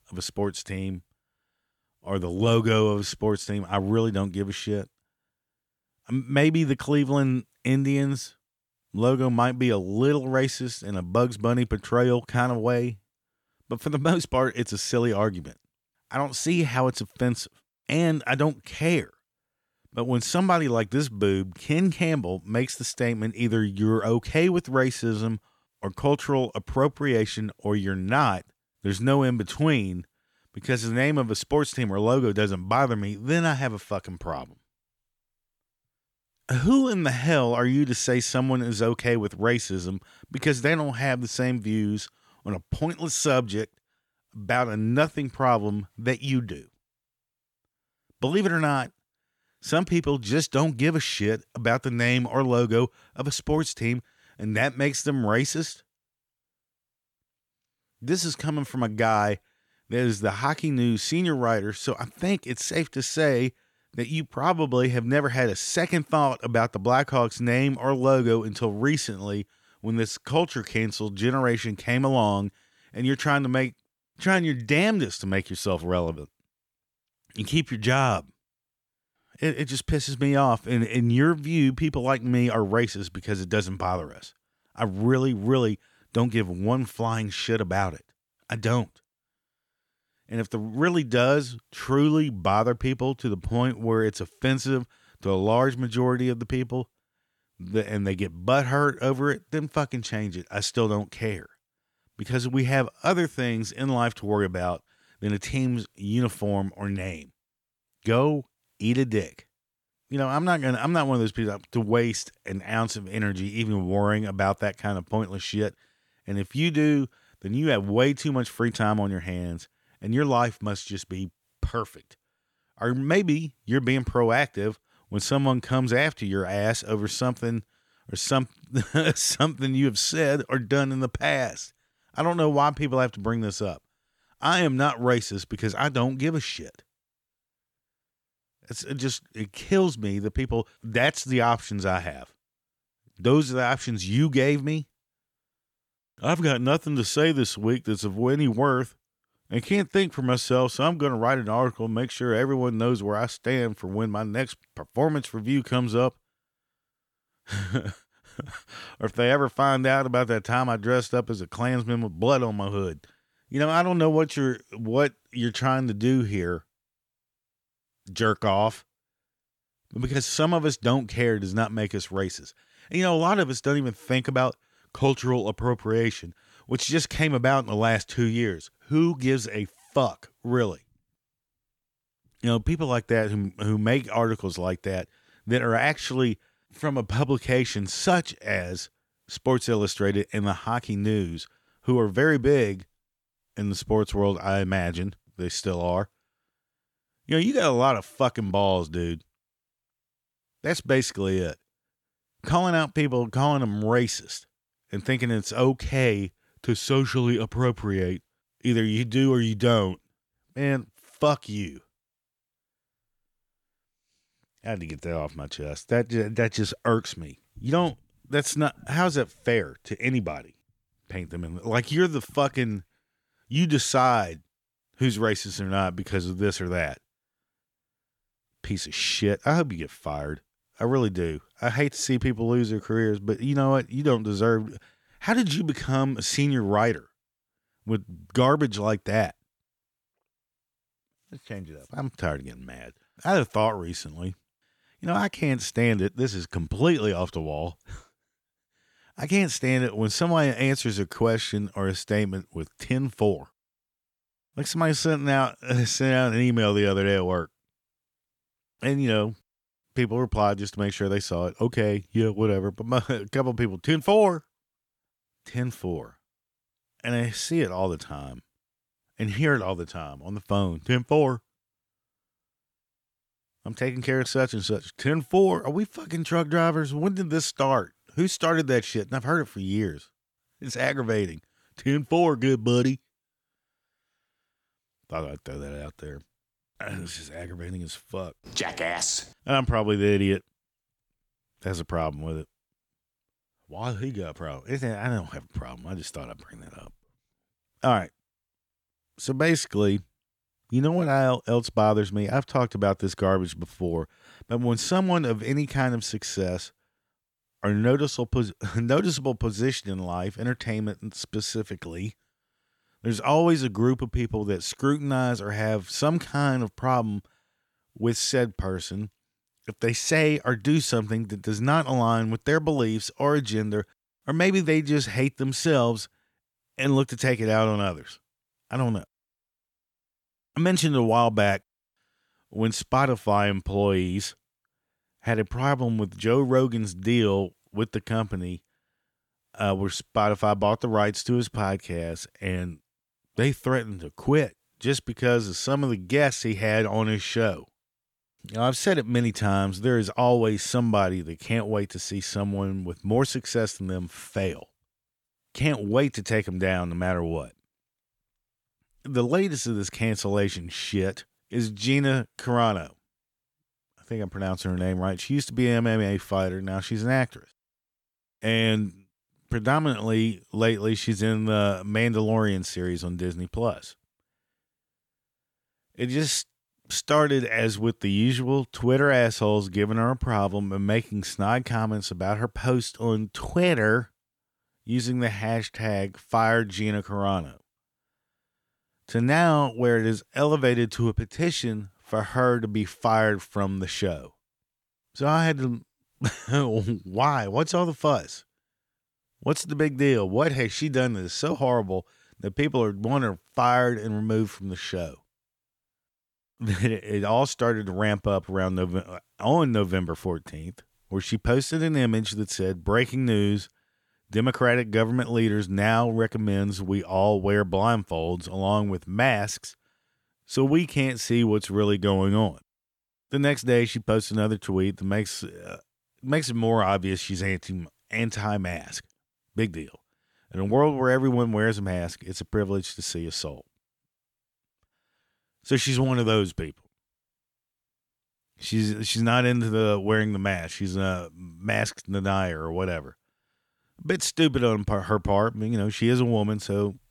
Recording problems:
none

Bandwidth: 18.5 kHz